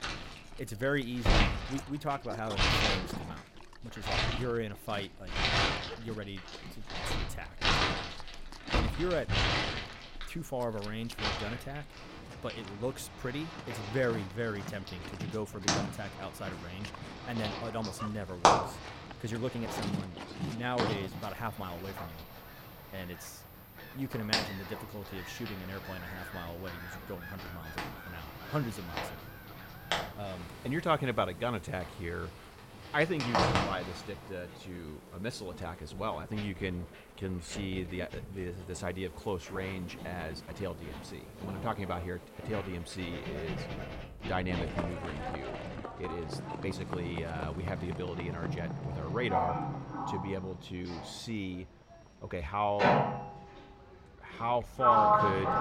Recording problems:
household noises; very loud; throughout; 4 dB above the speech
animal sounds; noticeable; throughout; 10 dB below the speech
uneven, jittery; strongly; from 6 to 55 s

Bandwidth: 16 kHz